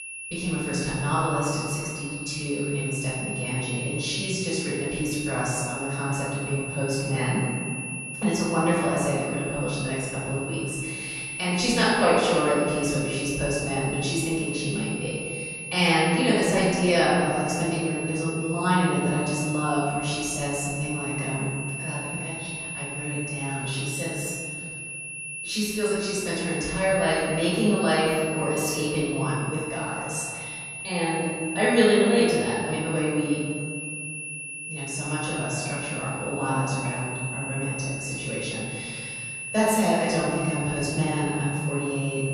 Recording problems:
room echo; strong; dies away in 2.1 s
off-mic speech; far
high-pitched whine; loud; throughout; 2.5 kHz, 7 dB below the speech

